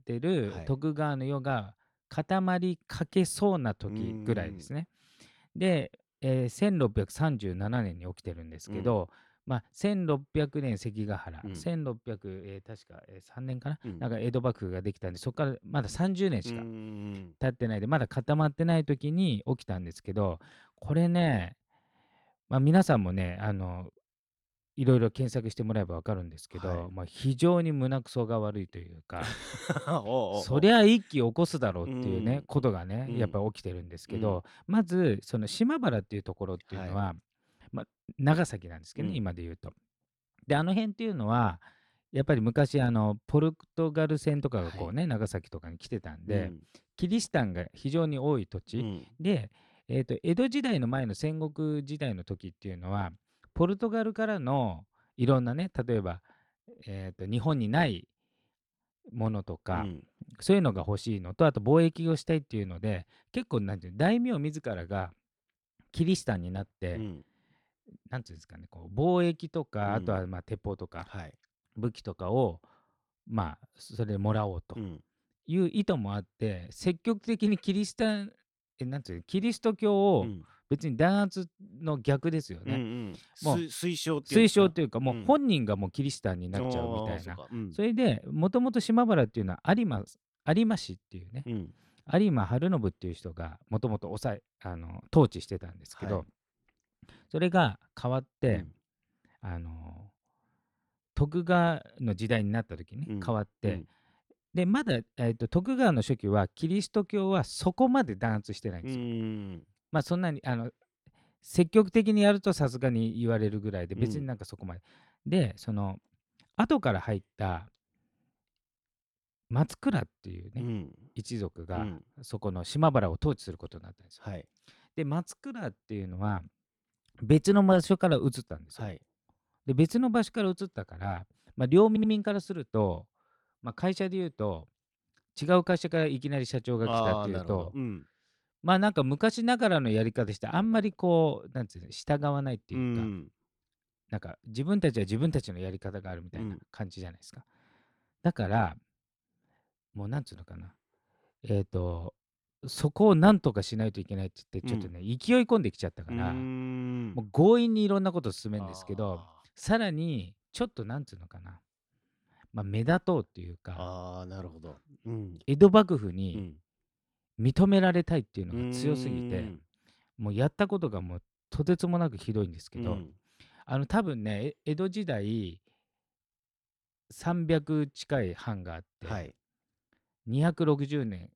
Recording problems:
audio stuttering; at 2:12

